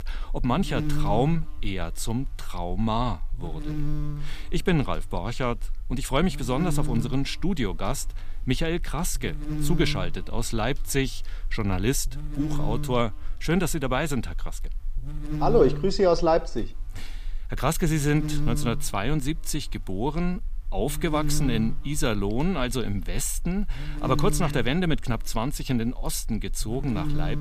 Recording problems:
electrical hum; noticeable; throughout; 50 Hz, 10 dB below the speech

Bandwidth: 15 kHz